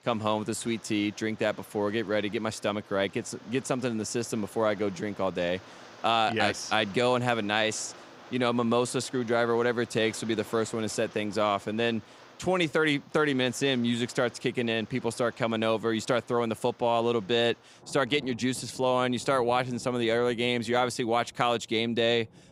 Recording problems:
rain or running water; faint; throughout; 25 dB below the speech

